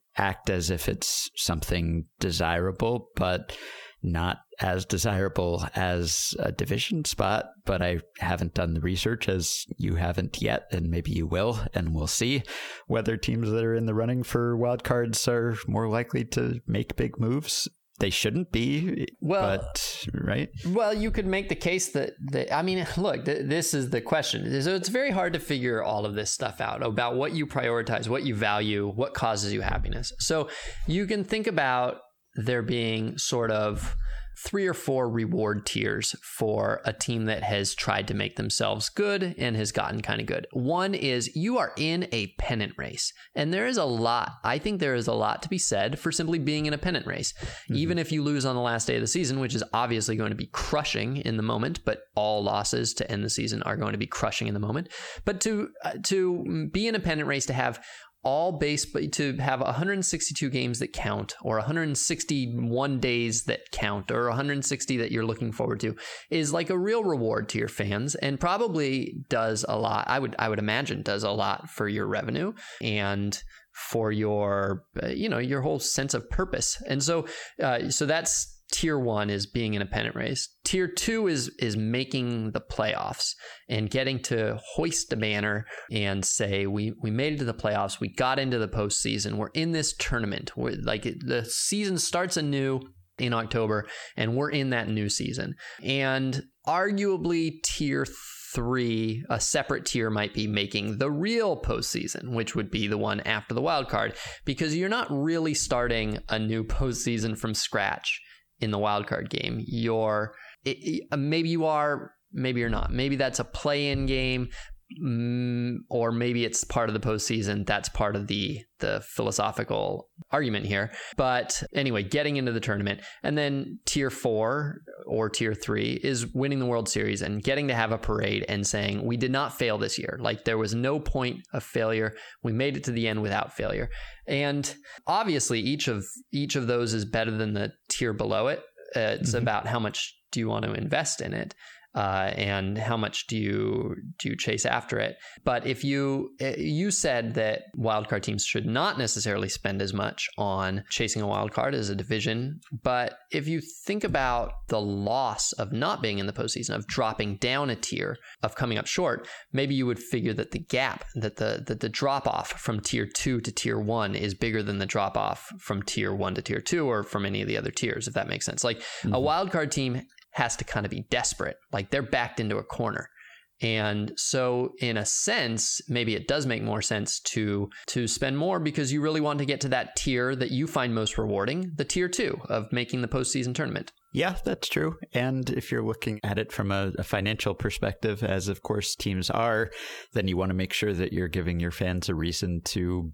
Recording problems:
squashed, flat; heavily

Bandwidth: 19 kHz